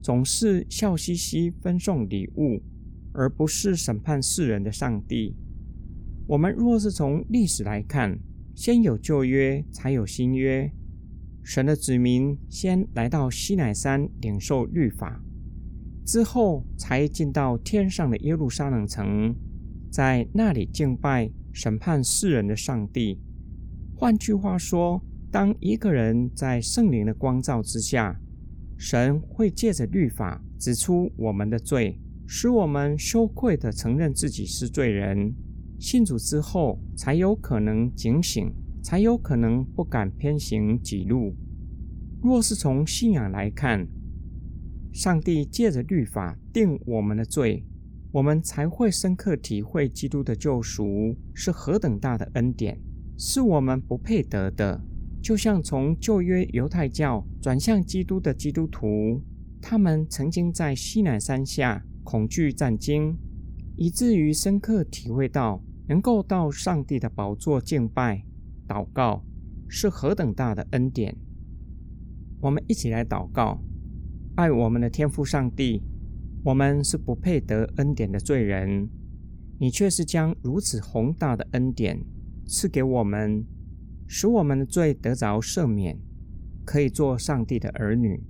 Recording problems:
low rumble; faint; throughout; 25 dB below the speech

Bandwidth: 18.5 kHz